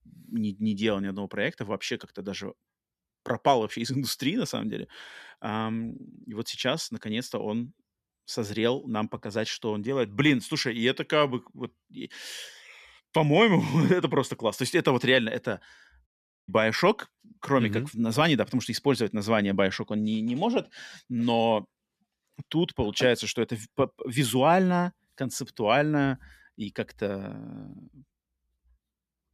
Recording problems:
audio cutting out; at 16 s

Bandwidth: 14.5 kHz